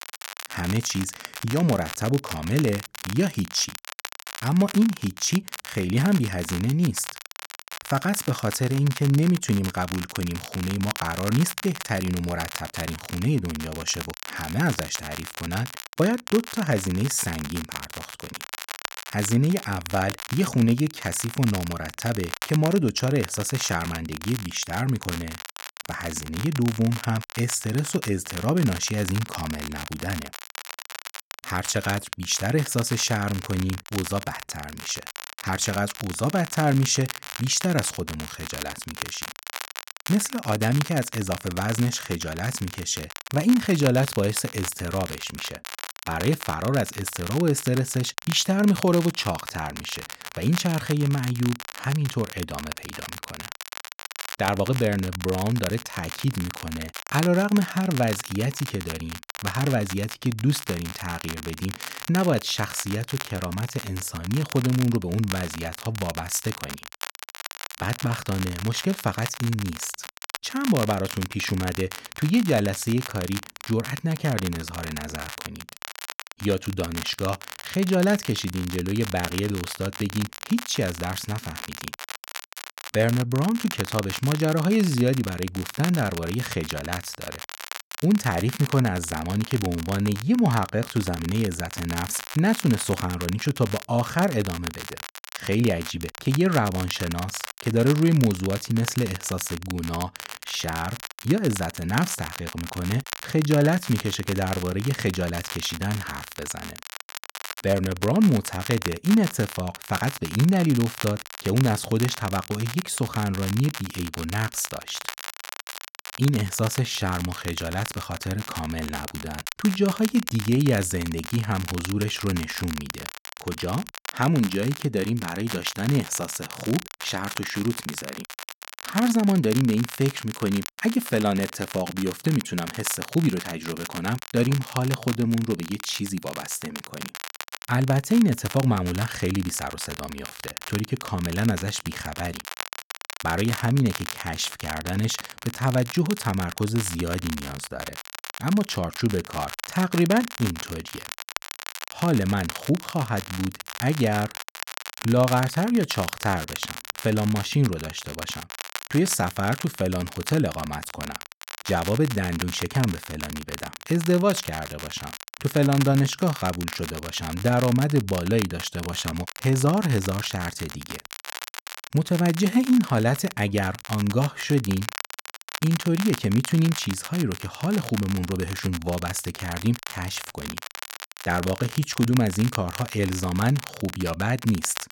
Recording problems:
crackle, like an old record; noticeable; 10 dB below the speech

